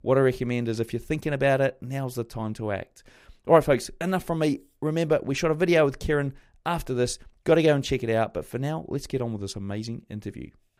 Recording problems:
none

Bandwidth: 15.5 kHz